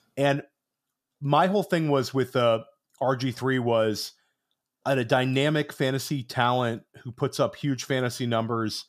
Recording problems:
none

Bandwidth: 14.5 kHz